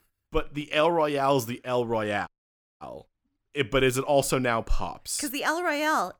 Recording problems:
audio cutting out; at 2.5 s for 0.5 s

